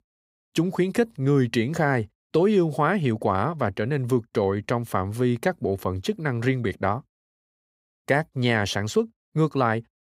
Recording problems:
none

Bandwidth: 15.5 kHz